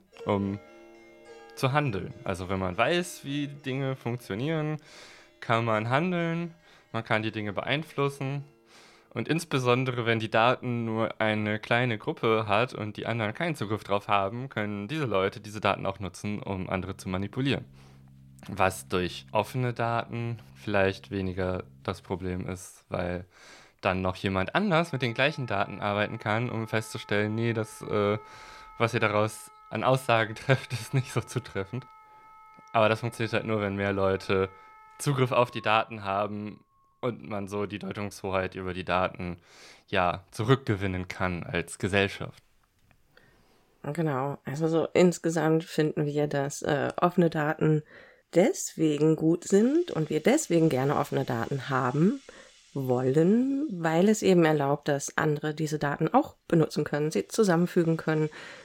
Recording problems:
background music; faint; throughout; 25 dB below the speech

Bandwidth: 16.5 kHz